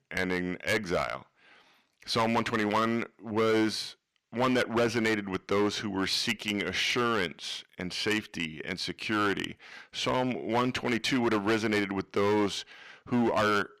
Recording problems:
distortion; heavy; 7% of the sound clipped

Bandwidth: 14.5 kHz